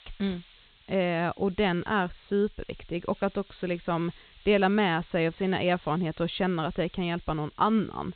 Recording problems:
high frequencies cut off; severe; nothing above 4 kHz
hiss; faint; throughout; 25 dB below the speech

